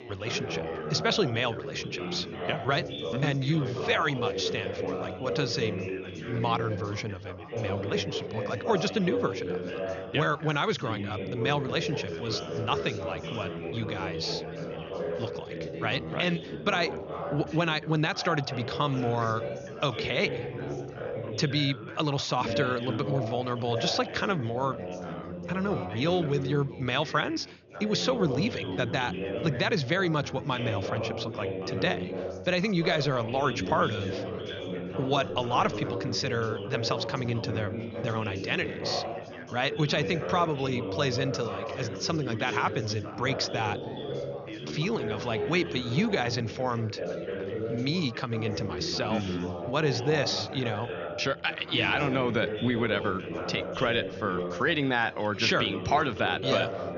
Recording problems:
high frequencies cut off; noticeable; nothing above 6.5 kHz
background chatter; loud; throughout; 4 voices, 6 dB below the speech

